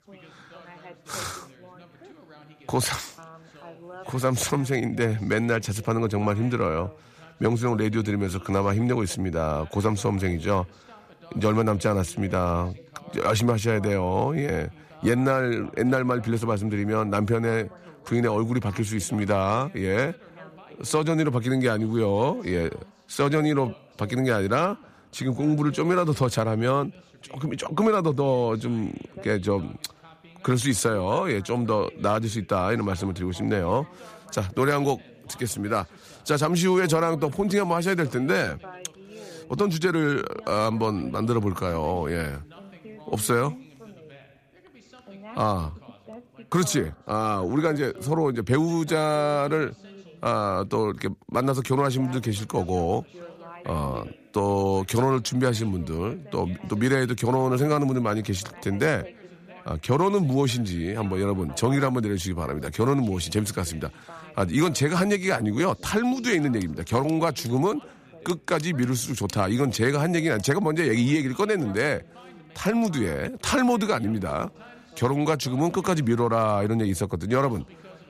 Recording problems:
background chatter; faint; throughout; 2 voices, 20 dB below the speech

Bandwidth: 14.5 kHz